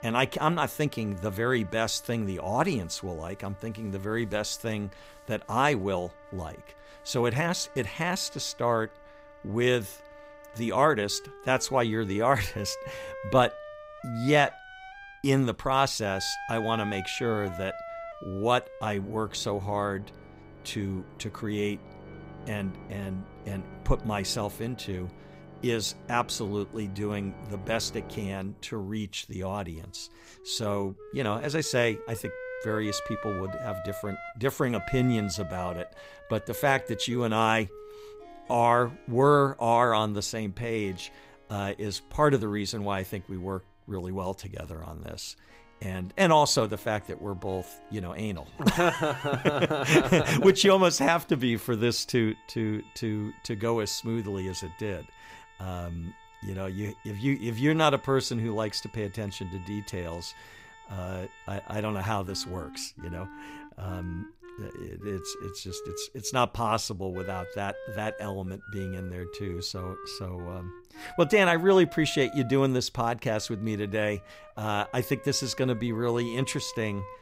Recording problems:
background music; noticeable; throughout; 15 dB below the speech

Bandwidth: 15.5 kHz